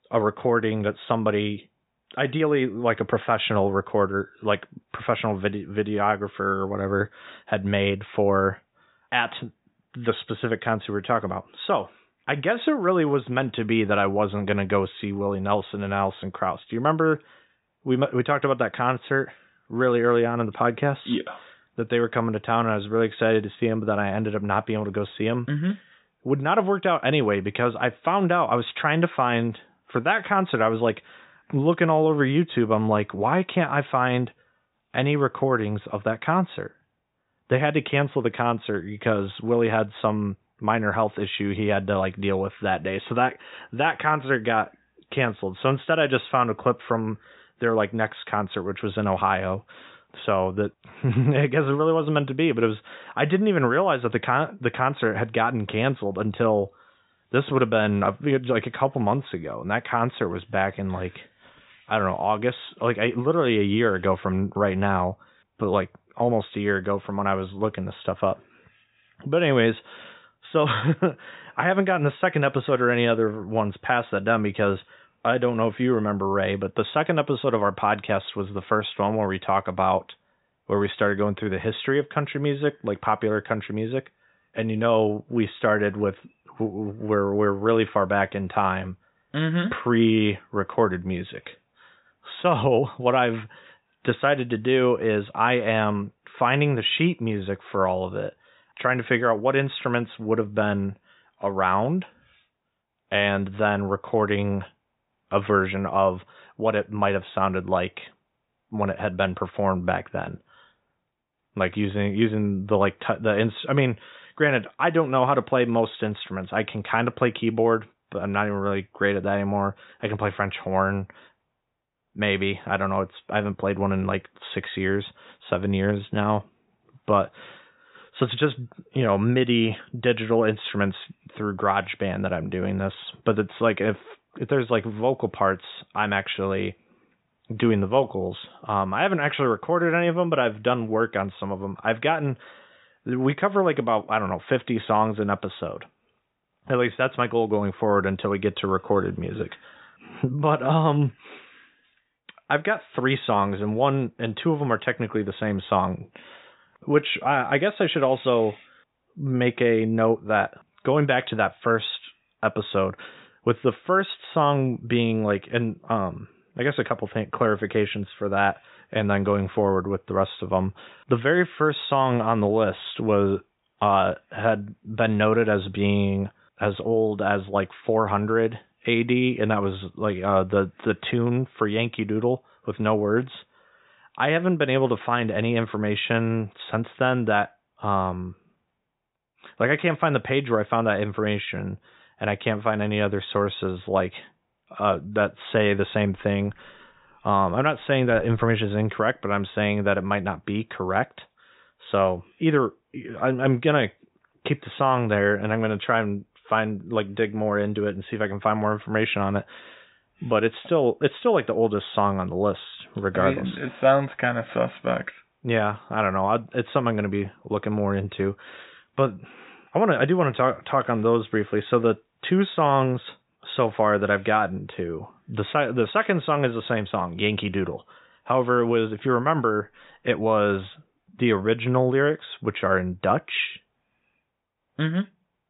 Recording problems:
high frequencies cut off; severe; nothing above 4 kHz

